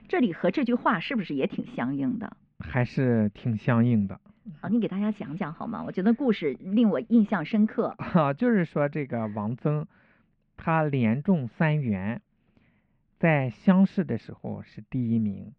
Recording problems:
muffled; very; fading above 2.5 kHz

